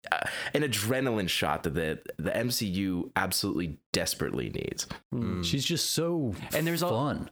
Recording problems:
squashed, flat; heavily

